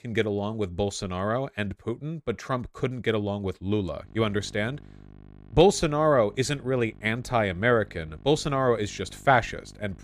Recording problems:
electrical hum; faint; from 4 s on; 50 Hz, 30 dB below the speech

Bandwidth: 15 kHz